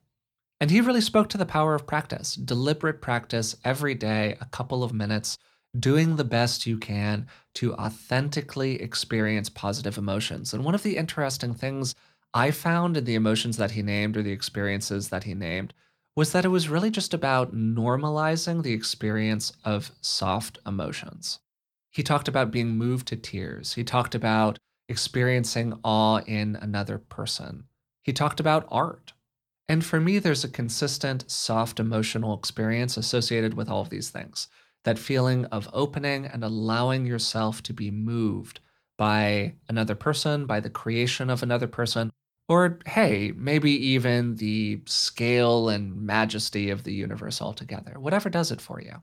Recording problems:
none

